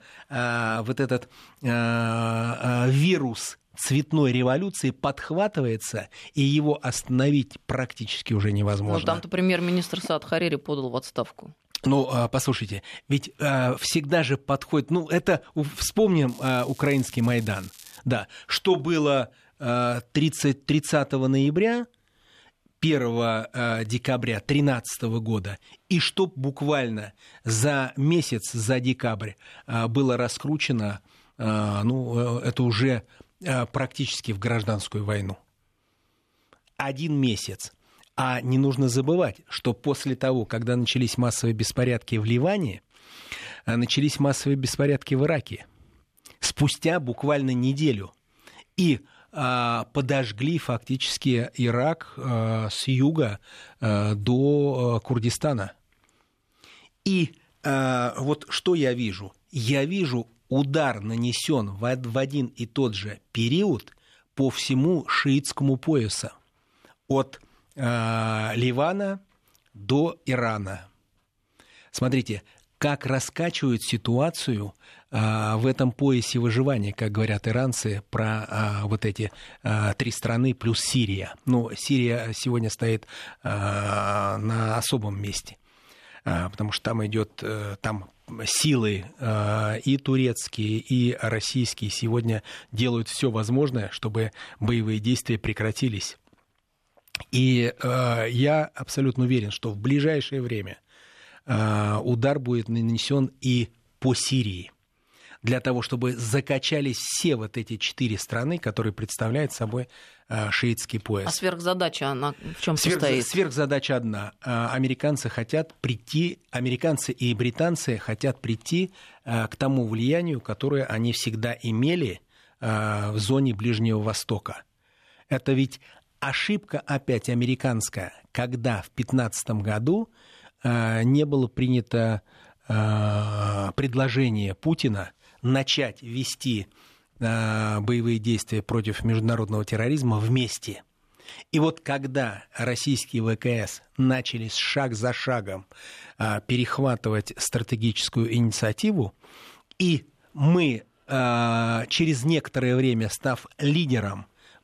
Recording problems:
crackling; noticeable; from 16 to 18 s; 20 dB below the speech

